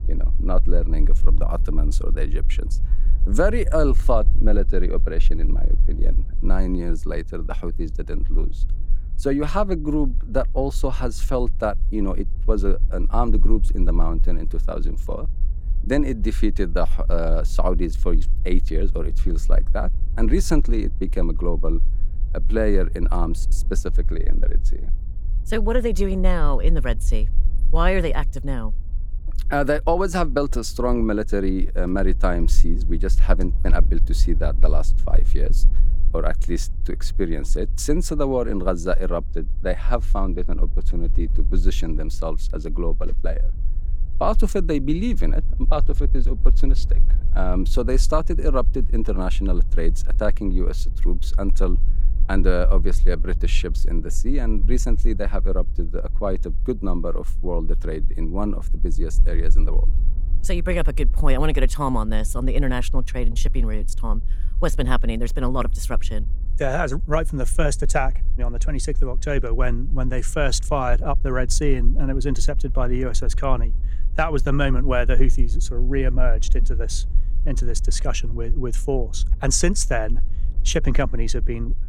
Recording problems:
low rumble; faint; throughout; 20 dB below the speech

